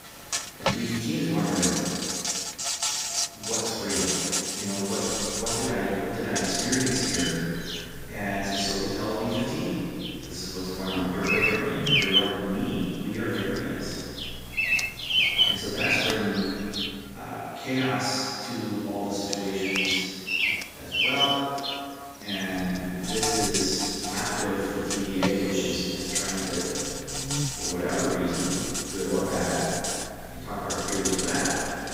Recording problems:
room echo; strong; dies away in 2.1 s
off-mic speech; far
animal sounds; very loud; throughout; 2 dB above the speech
hiss; noticeable; throughout; 15 dB below the speech
electrical hum; faint; from 5 to 17 s and from 22 s on; 60 Hz, 20 dB below the speech

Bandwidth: 15.5 kHz